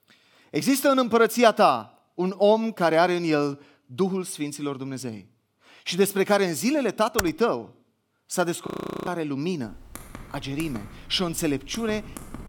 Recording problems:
keyboard typing; very faint; at 7 s; peak 6 dB below the speech
audio freezing; at 8.5 s
keyboard typing; faint; from 9.5 s on; peak 15 dB below the speech

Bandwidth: 17.5 kHz